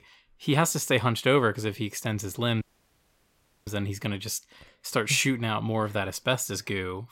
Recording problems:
audio cutting out; at 2.5 s for 1 s

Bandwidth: 16 kHz